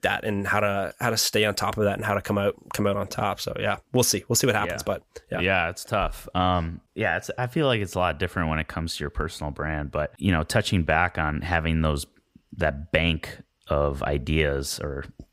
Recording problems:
none

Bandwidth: 15.5 kHz